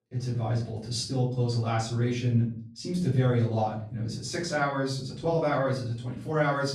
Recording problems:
off-mic speech; far
room echo; noticeable; dies away in 0.5 s

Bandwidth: 13.5 kHz